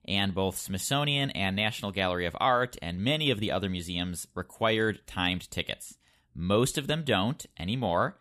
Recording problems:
none

